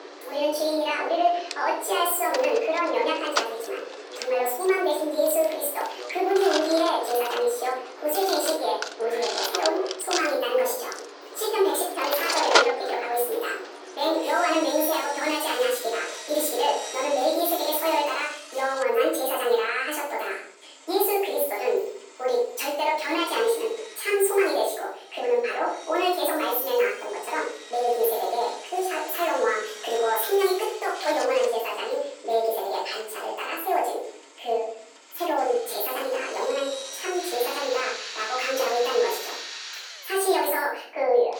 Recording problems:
off-mic speech; far
thin; very; fading below 400 Hz
wrong speed and pitch; too fast and too high; 1.5 times normal speed
room echo; noticeable; dies away in 0.6 s
machinery noise; loud; throughout; 8 dB below the speech

